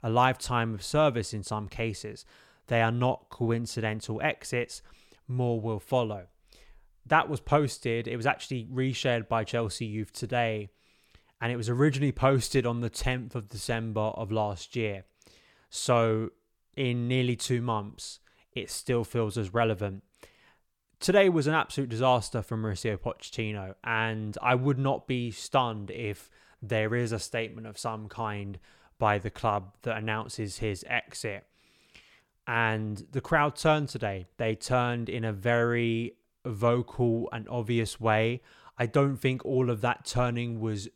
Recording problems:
none

